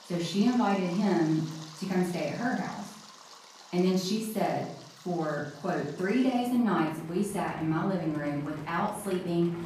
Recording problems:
off-mic speech; far
room echo; noticeable; dies away in 0.5 s
rain or running water; noticeable; throughout; 20 dB below the speech

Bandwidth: 14.5 kHz